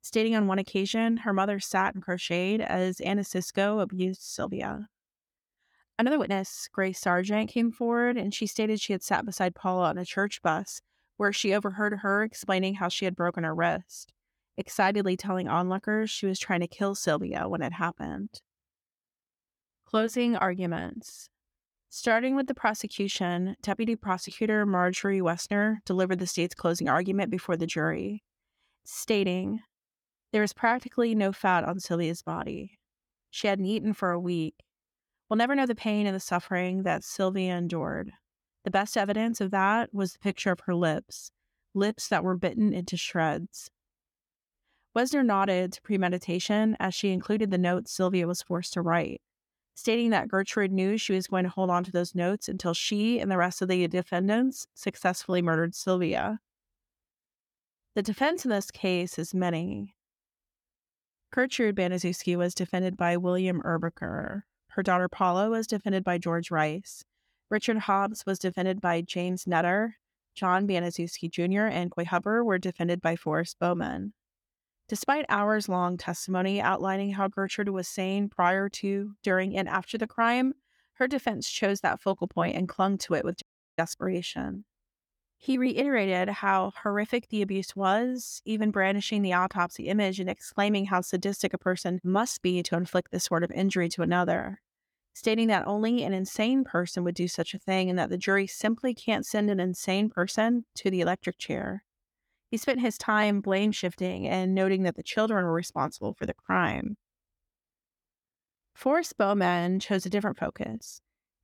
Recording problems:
uneven, jittery; strongly; from 6 s to 1:27
audio cutting out; at 1:23

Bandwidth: 17.5 kHz